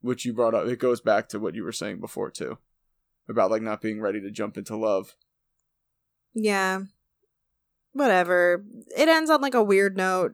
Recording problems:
none

